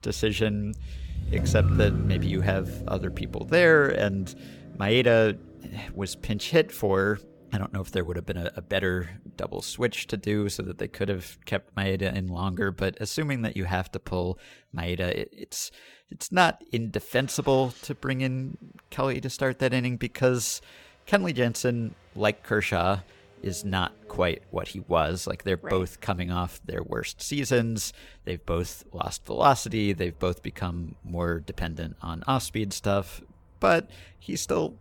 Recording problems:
traffic noise; loud; throughout; 5 dB below the speech

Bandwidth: 17.5 kHz